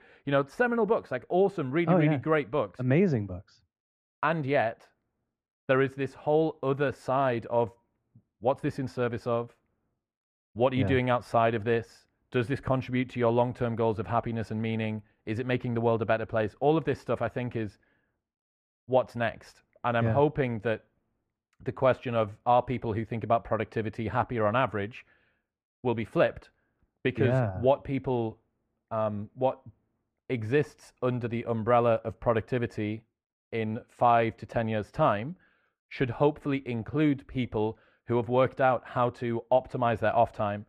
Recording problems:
muffled; very; fading above 3.5 kHz

